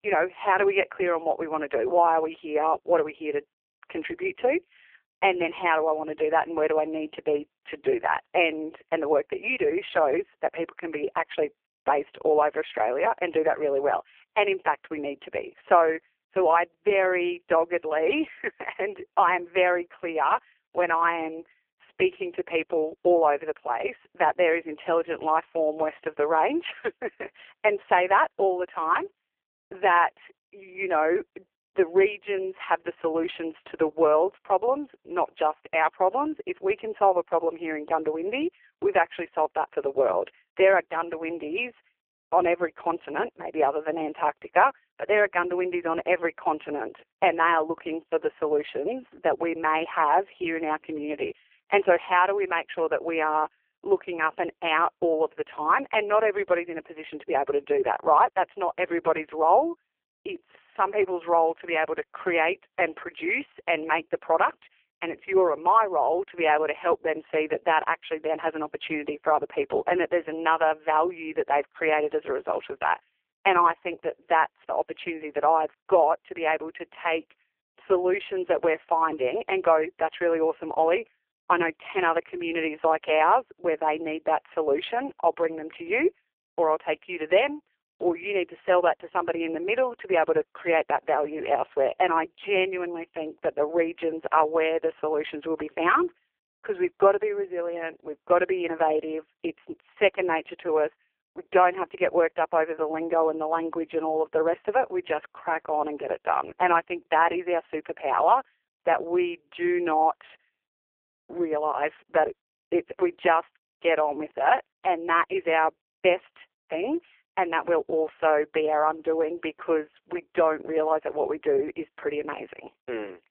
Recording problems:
phone-call audio; poor line

